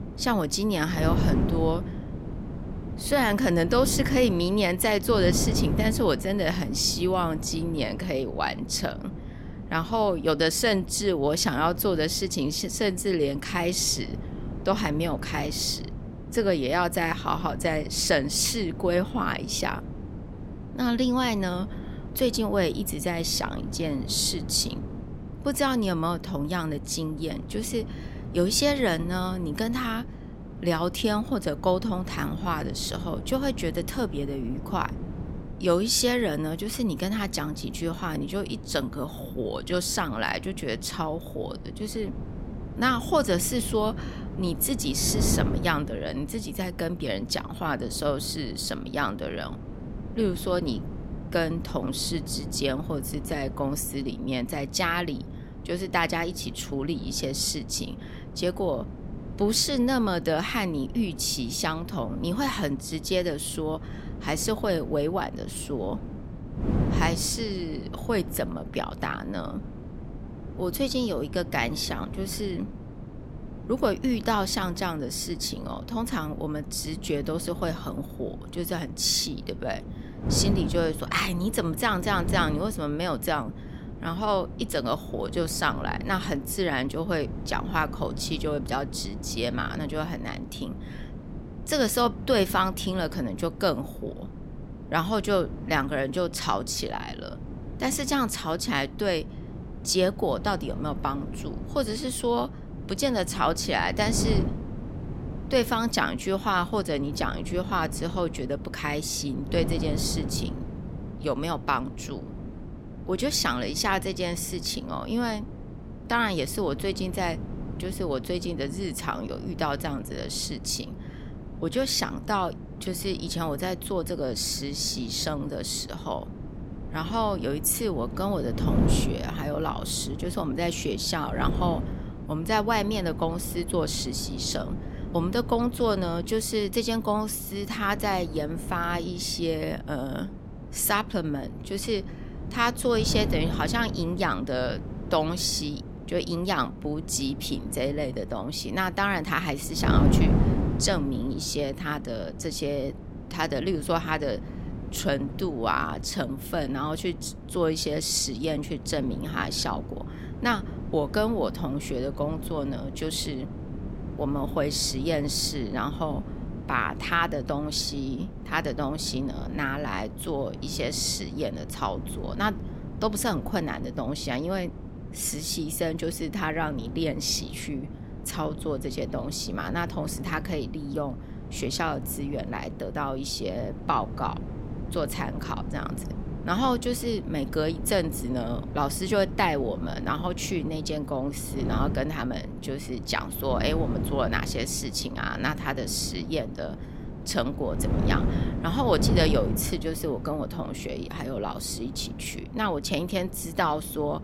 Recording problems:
wind noise on the microphone; occasional gusts; 15 dB below the speech

